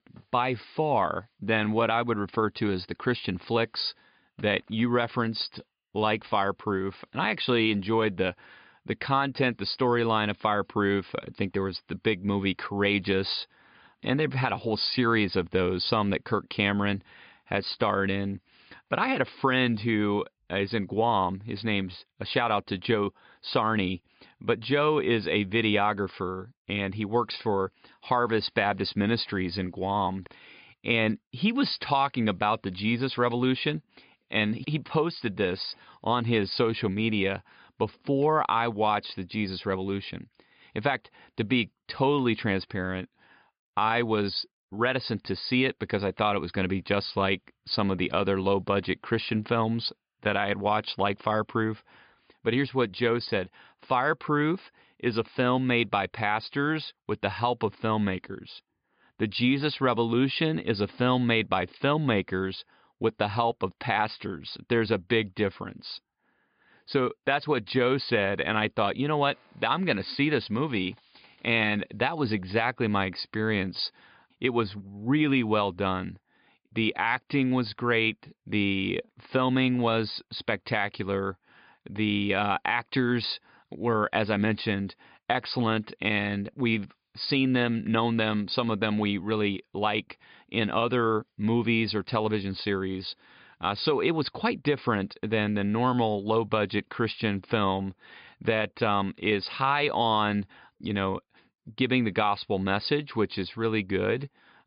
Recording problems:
high frequencies cut off; severe; nothing above 5 kHz

